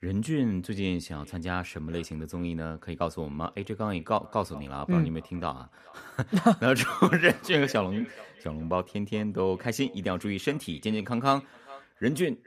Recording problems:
echo of what is said; faint; throughout; 420 ms later, 20 dB below the speech

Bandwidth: 15 kHz